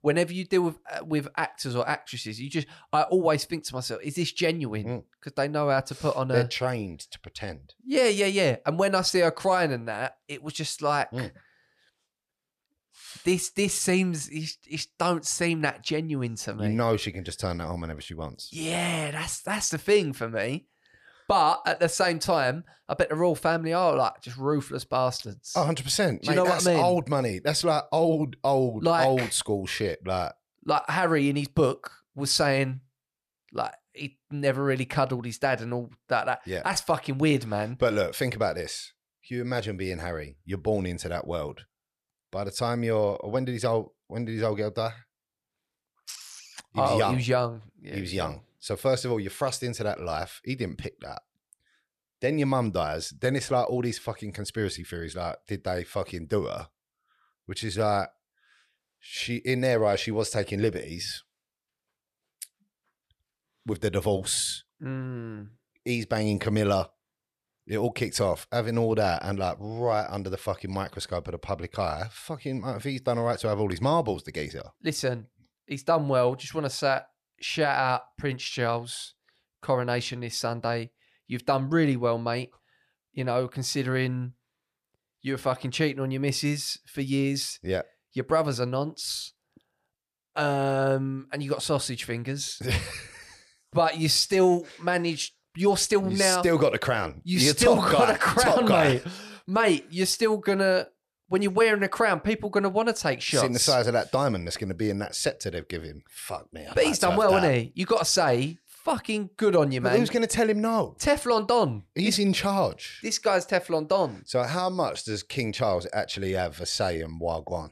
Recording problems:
none

